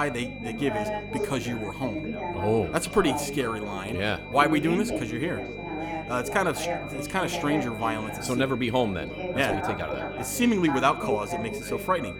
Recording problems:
echo of what is said; faint; throughout; 90 ms later, 20 dB below the speech
background chatter; loud; throughout; 4 voices, 6 dB below the speech
high-pitched whine; noticeable; throughout; 2.5 kHz, 15 dB below the speech
electrical hum; faint; throughout; 50 Hz, 25 dB below the speech
abrupt cut into speech; at the start

